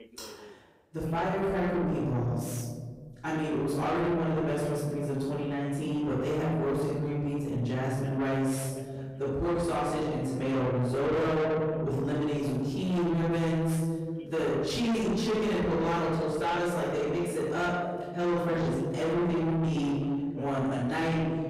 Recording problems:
distortion; heavy; 7 dB below the speech
off-mic speech; far
room echo; noticeable; dies away in 1.5 s
voice in the background; faint; throughout; 25 dB below the speech

